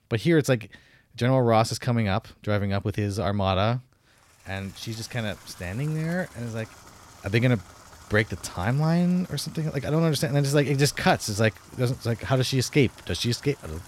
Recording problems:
household noises; faint; from 4.5 s on; 25 dB below the speech

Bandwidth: 16 kHz